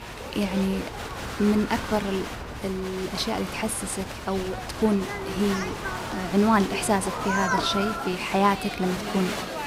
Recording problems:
crowd noise; loud; throughout; 5 dB below the speech

